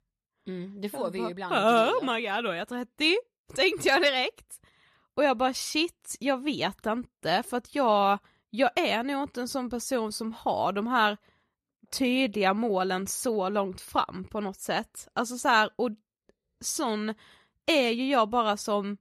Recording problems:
none

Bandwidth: 14.5 kHz